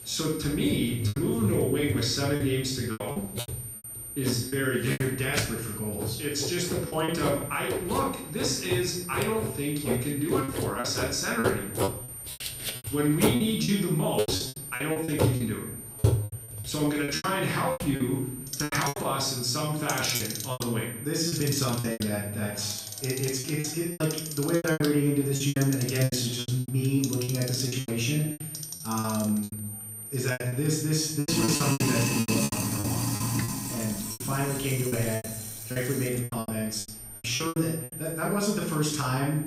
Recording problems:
off-mic speech; far
room echo; noticeable; dies away in 0.6 s
household noises; loud; throughout; 5 dB below the speech
high-pitched whine; noticeable; throughout; 9 kHz, 10 dB below the speech
murmuring crowd; faint; throughout; 30 dB below the speech
choppy; very; 12% of the speech affected

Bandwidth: 15.5 kHz